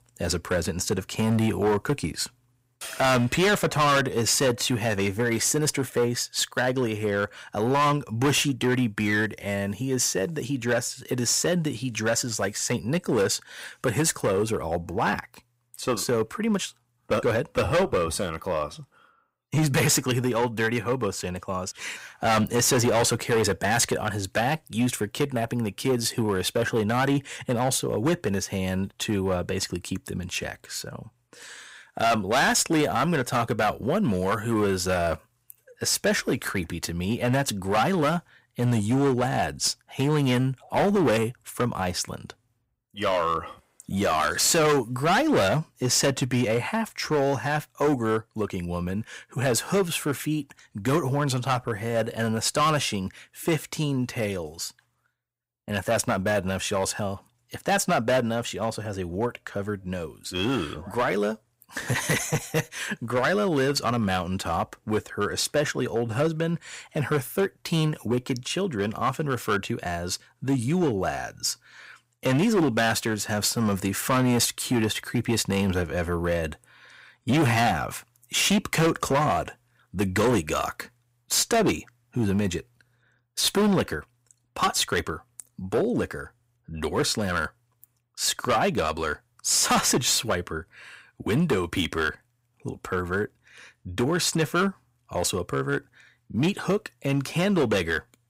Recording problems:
distortion; heavy; 8% of the sound clipped

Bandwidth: 15.5 kHz